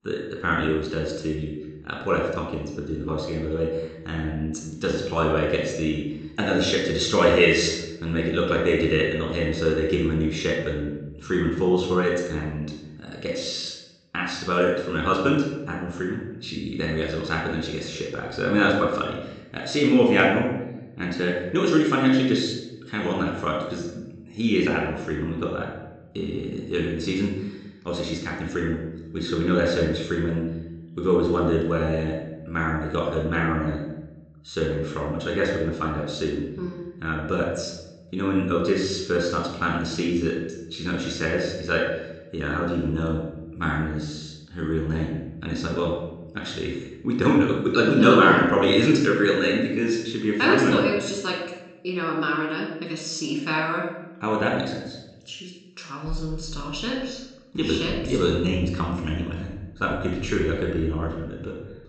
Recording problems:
room echo; noticeable; dies away in 0.8 s
high frequencies cut off; noticeable; nothing above 8 kHz
off-mic speech; somewhat distant

